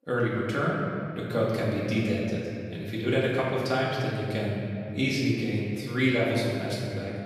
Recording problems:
off-mic speech; far
room echo; noticeable; dies away in 2.6 s

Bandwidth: 14.5 kHz